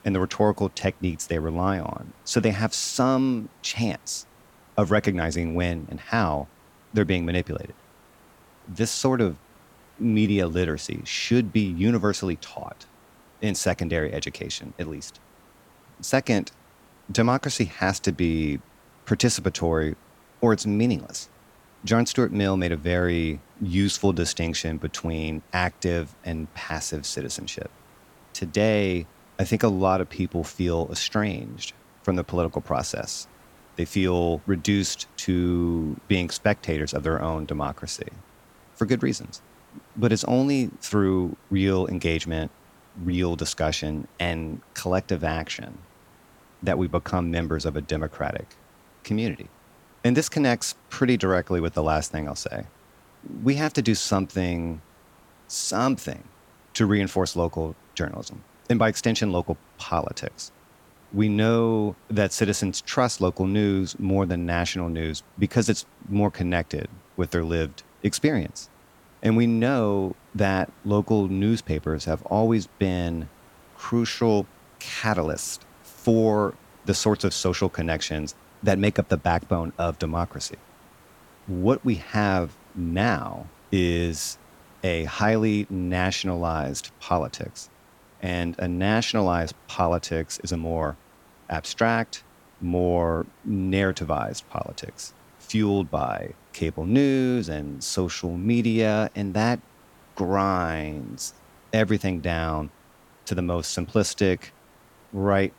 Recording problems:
hiss; faint; throughout; 30 dB below the speech

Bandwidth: 18 kHz